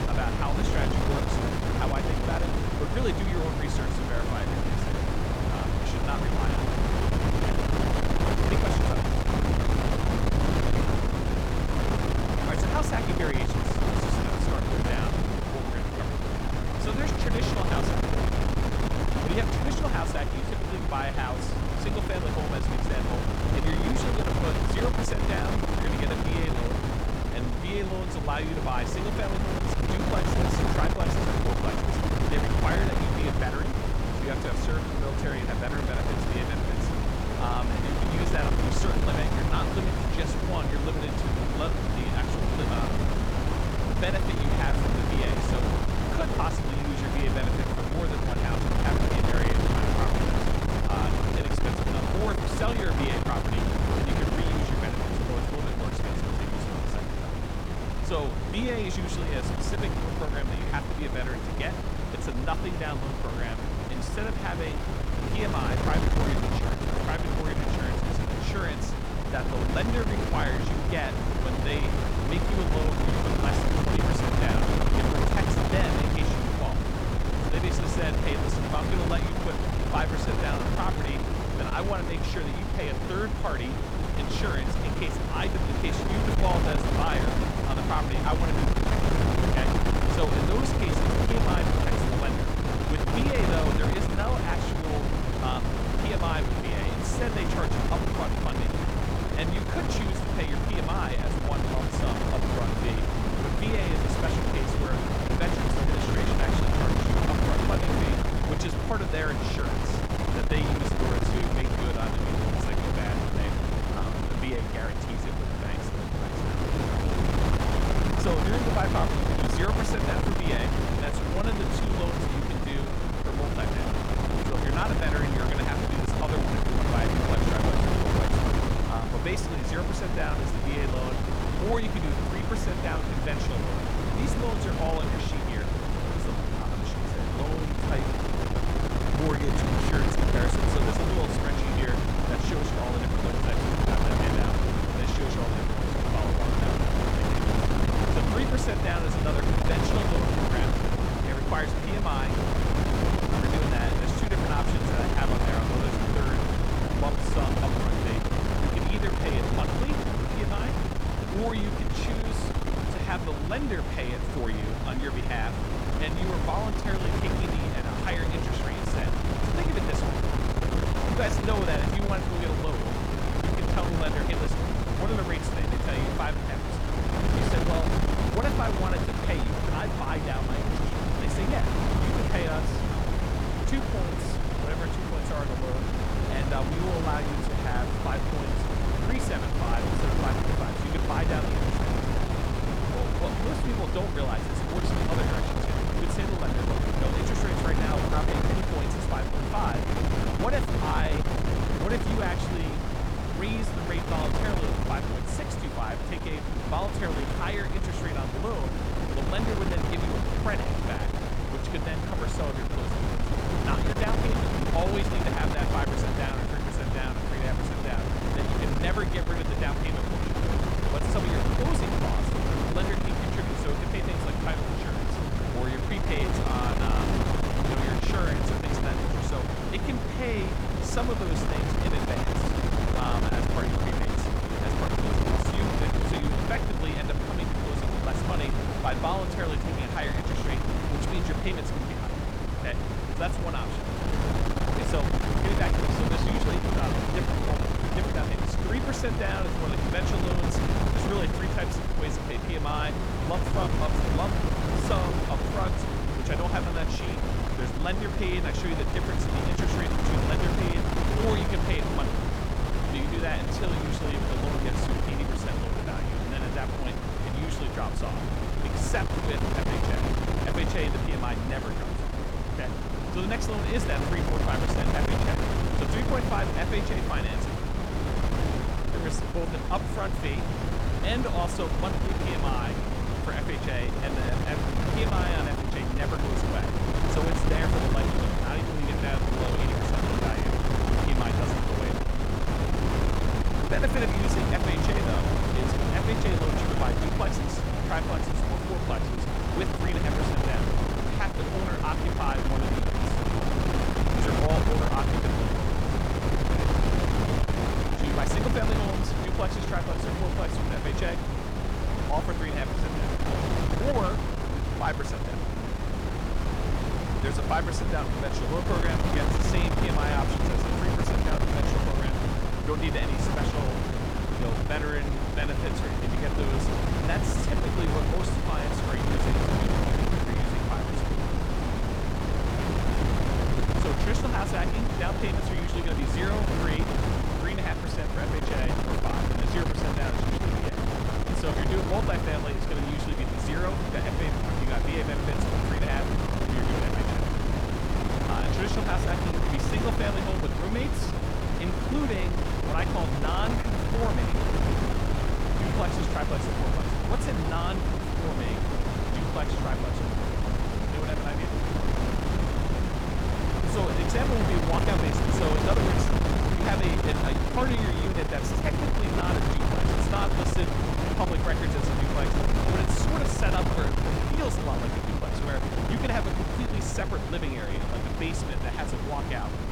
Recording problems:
wind noise on the microphone; heavy; 2 dB above the speech

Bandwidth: 18 kHz